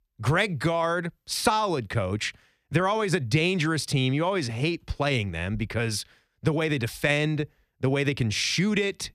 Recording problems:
none

